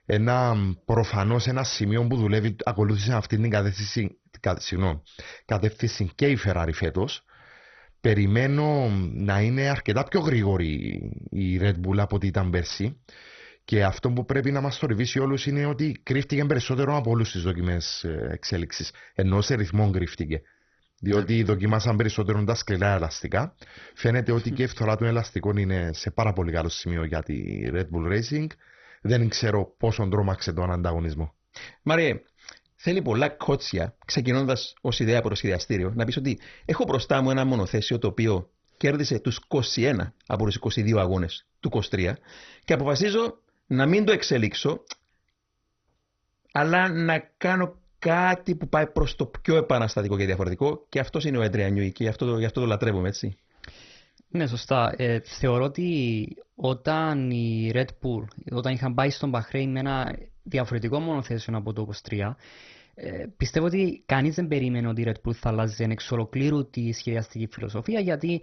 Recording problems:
garbled, watery; badly; nothing above 6 kHz

